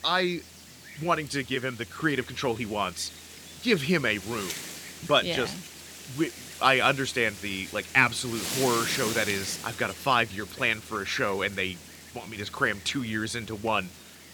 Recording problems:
wind noise on the microphone; occasional gusts; 15 dB below the speech

